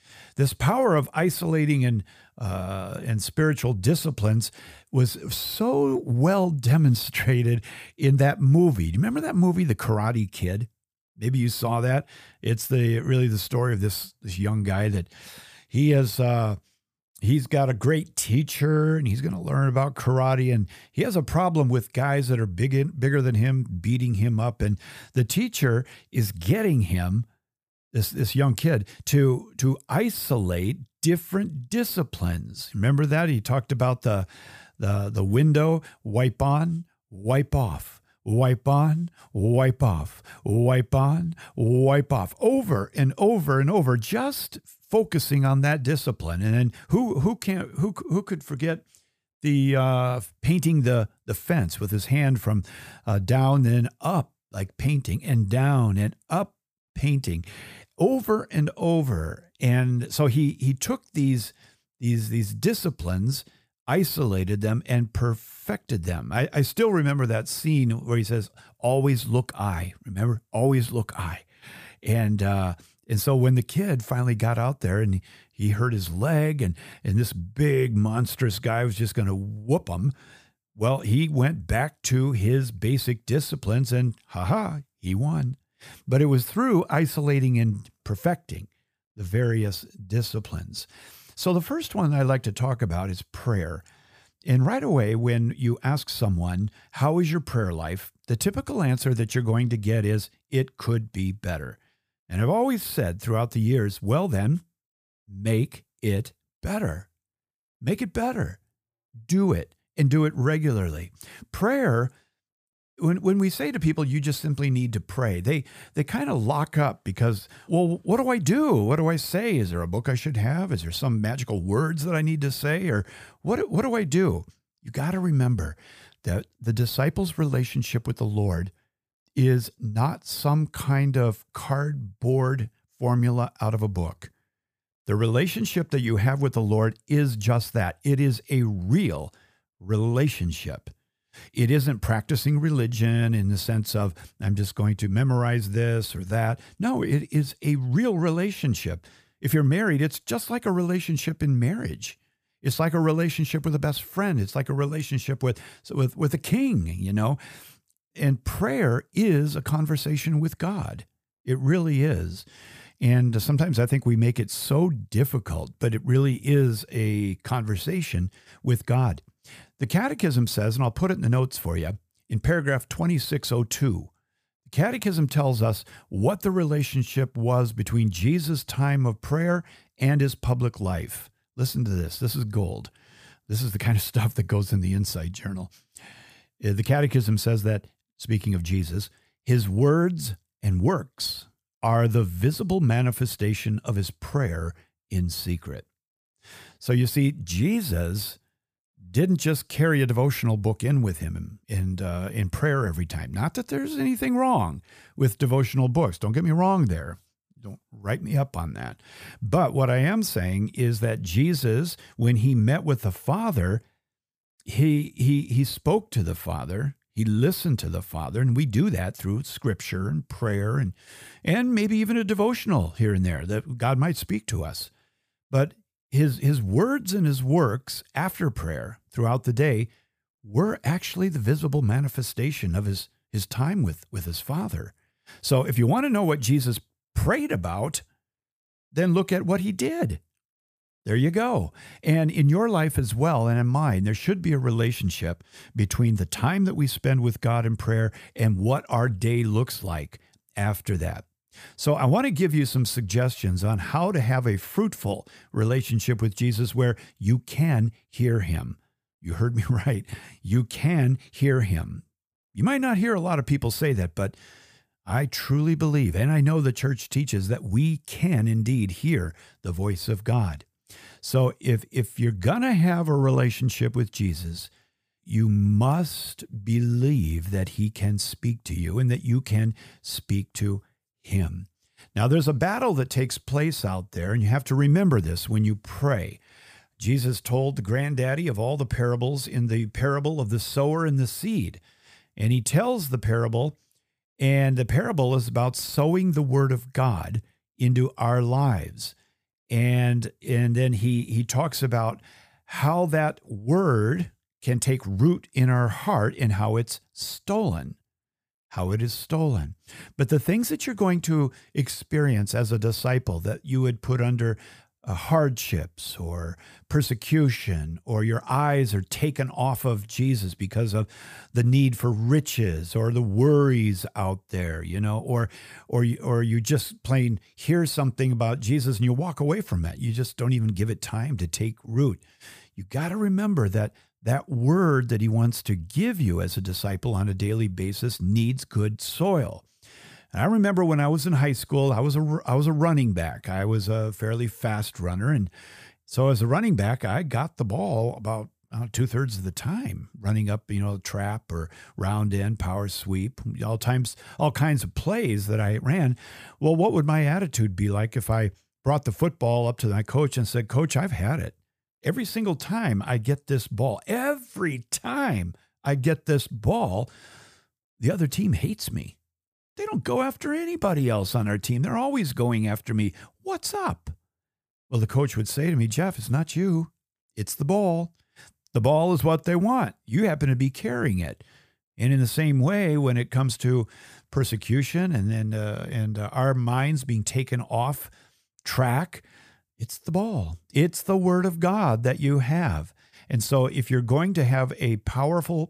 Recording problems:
none

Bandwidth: 15 kHz